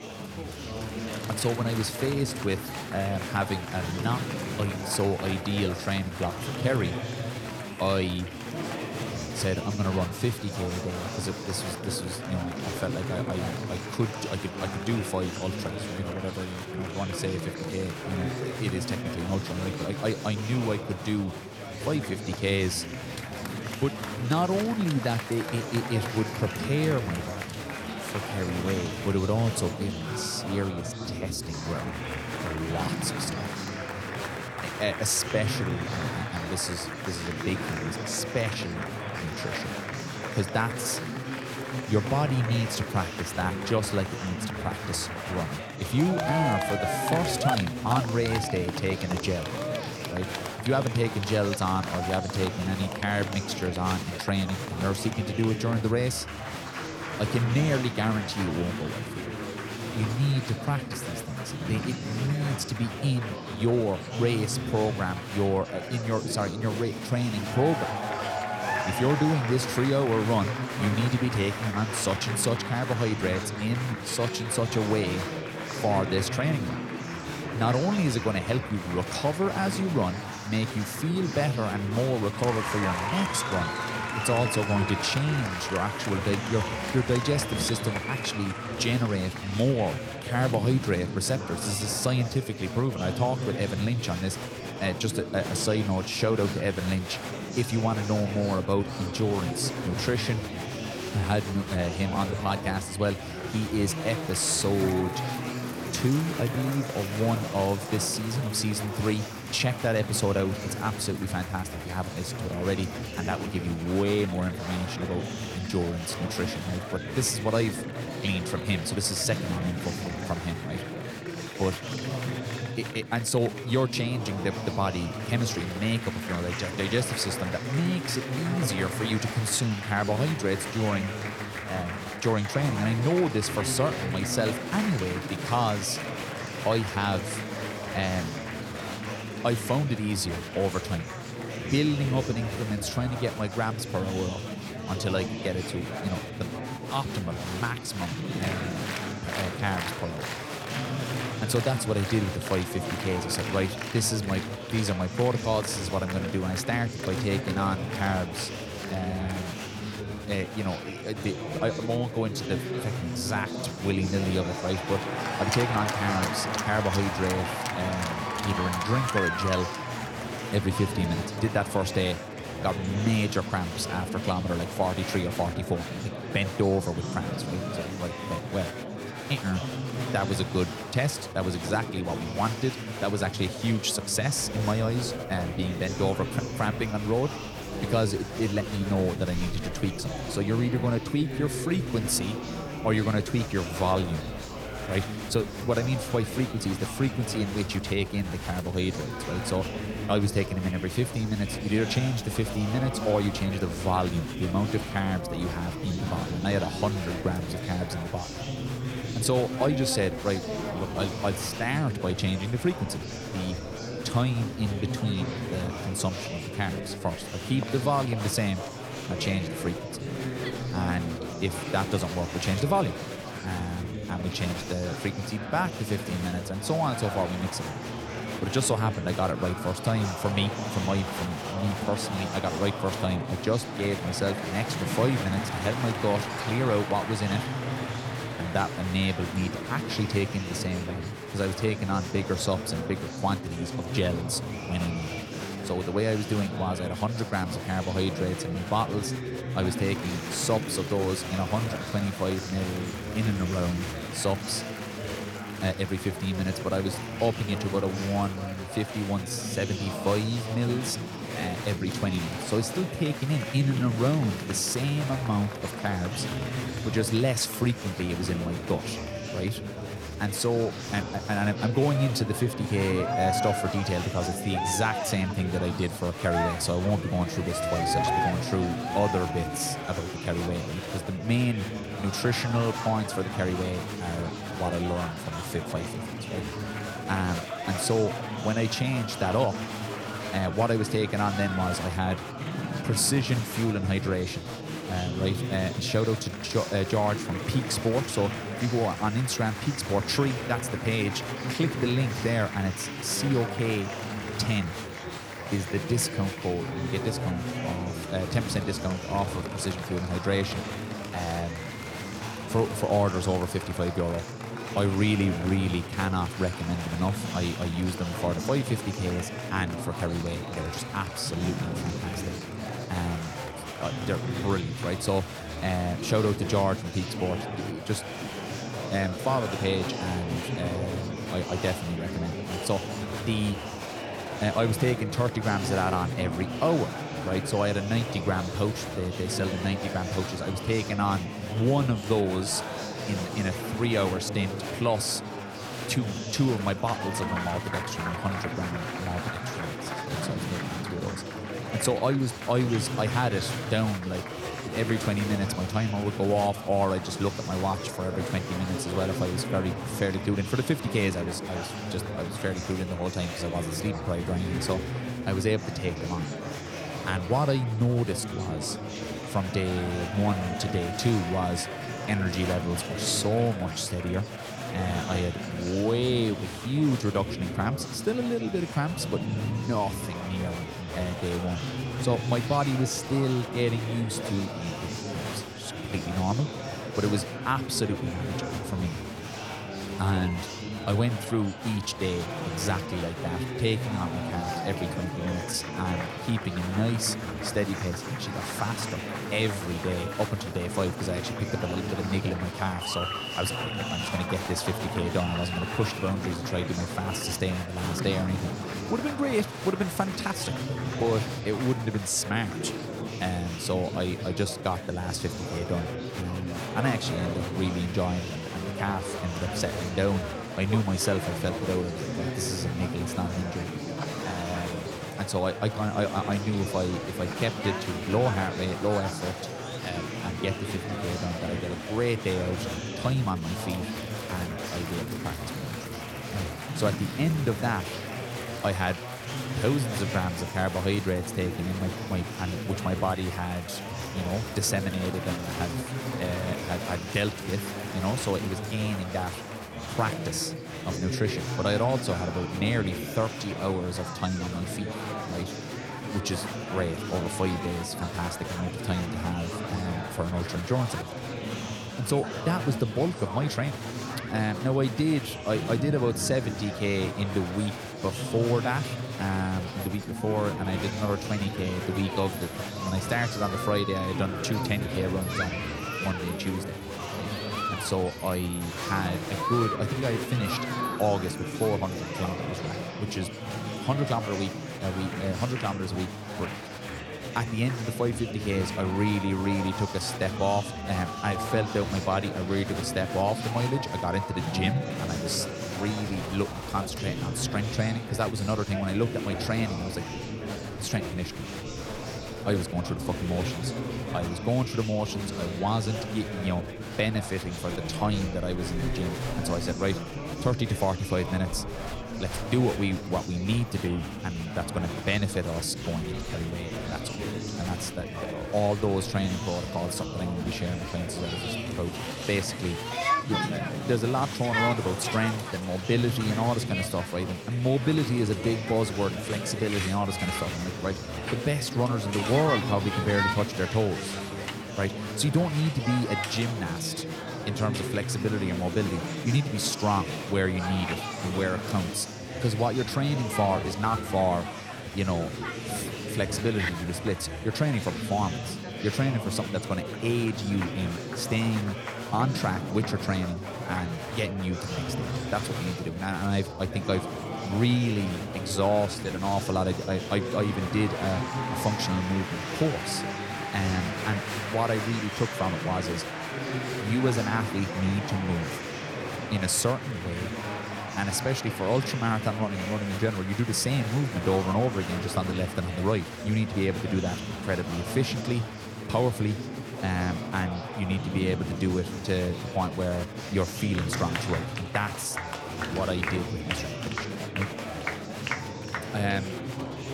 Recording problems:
chatter from many people; loud; throughout; 4 dB below the speech

